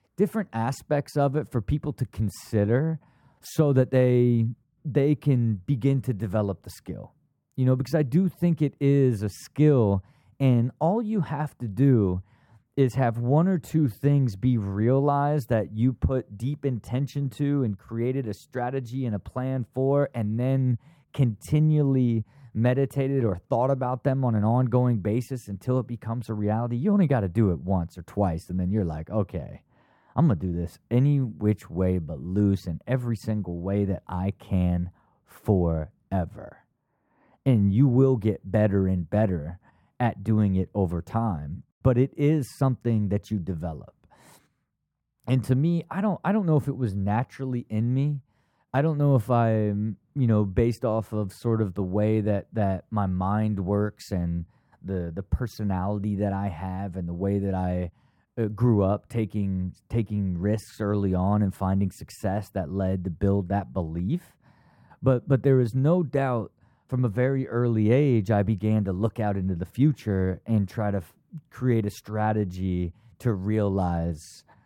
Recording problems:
muffled; slightly; fading above 2 kHz

